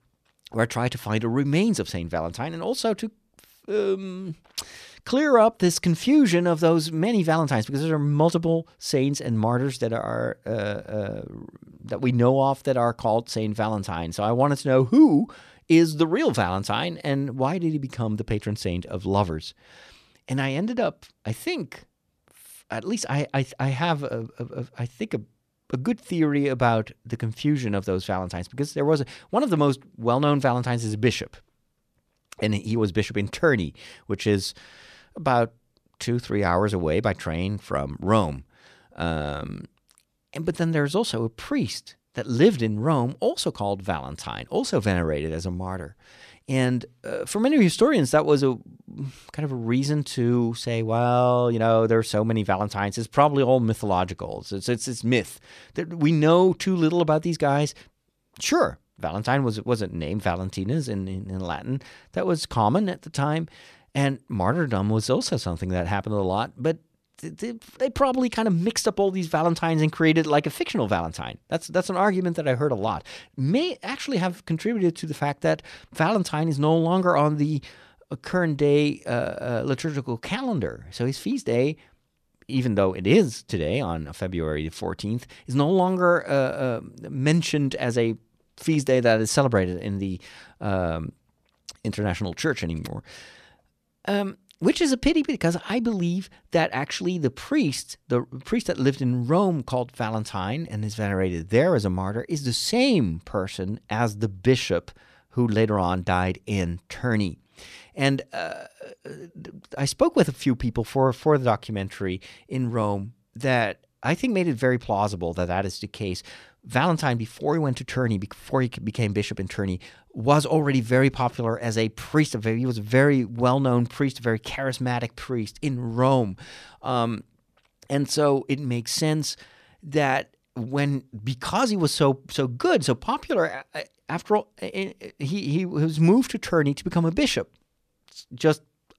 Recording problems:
none

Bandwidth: 14 kHz